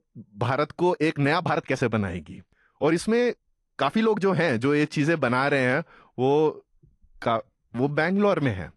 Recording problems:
garbled, watery; slightly
uneven, jittery; strongly; from 1 to 8 s

